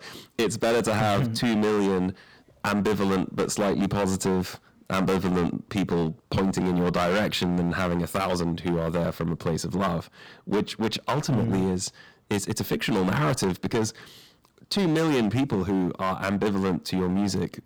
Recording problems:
distortion; heavy; 15% of the sound clipped

